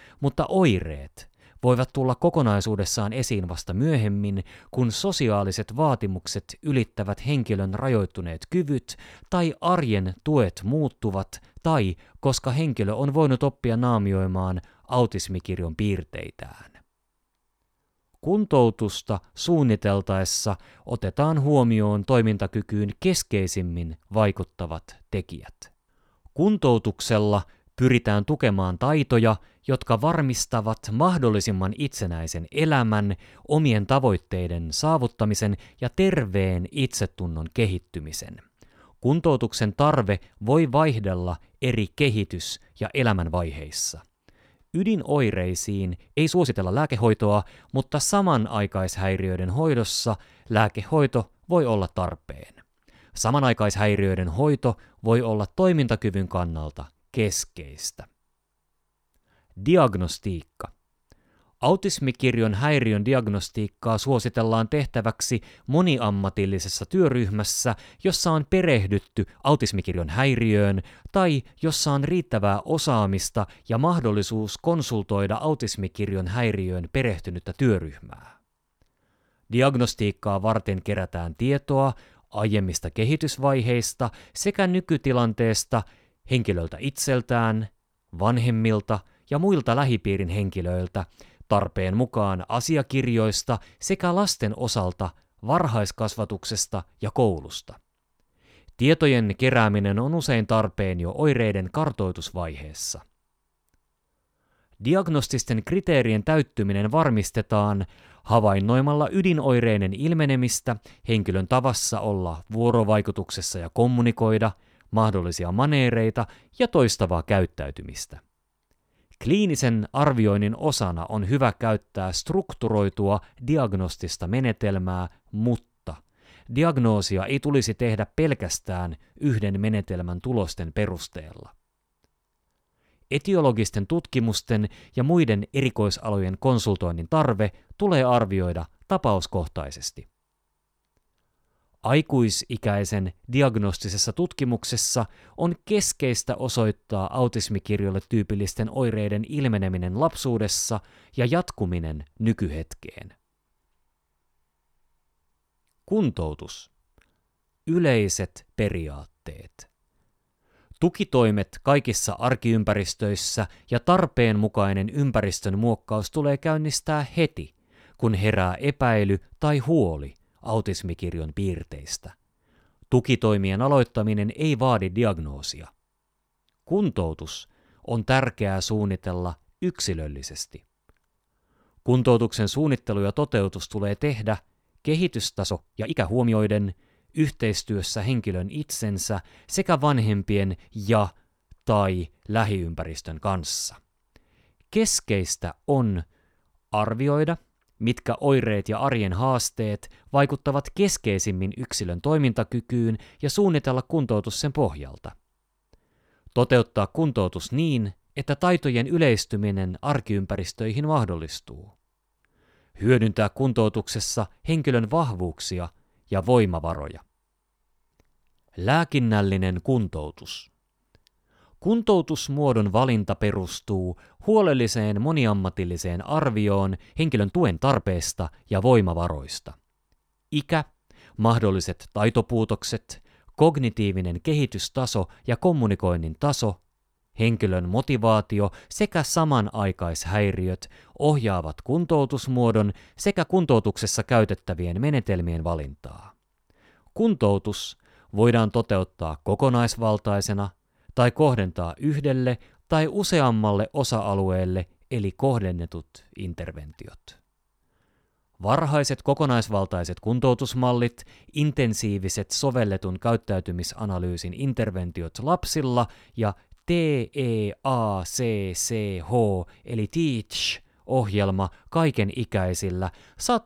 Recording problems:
uneven, jittery; strongly; from 12 s to 4:04

